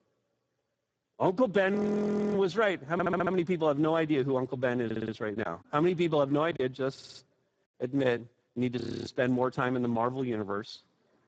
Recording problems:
garbled, watery; badly; nothing above 7.5 kHz
audio freezing; at 2 s for 0.5 s and at 9 s
audio stuttering; at 3 s, at 5 s and at 7 s
choppy; occasionally; from 5.5 to 6.5 s; 3% of the speech affected

